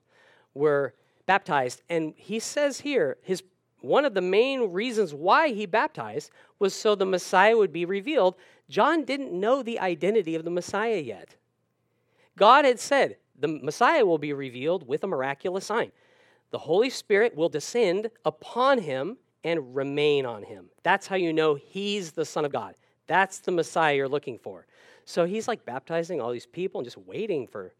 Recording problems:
uneven, jittery; strongly; from 1 to 27 s

